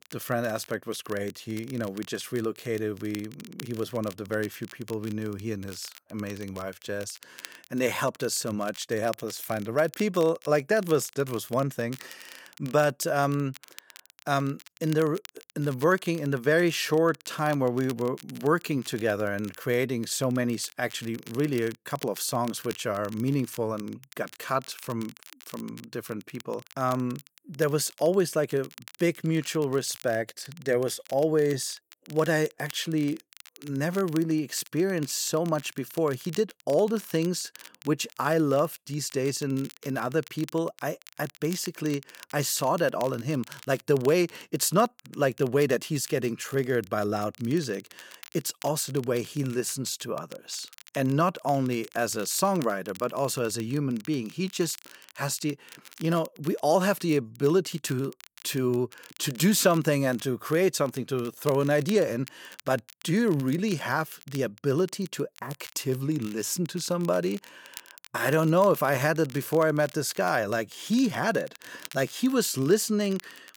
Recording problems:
crackle, like an old record; faint; 20 dB below the speech

